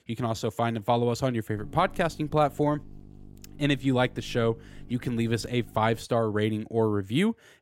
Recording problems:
electrical hum; faint; from 1.5 to 6 s; 50 Hz, 30 dB below the speech

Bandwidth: 16 kHz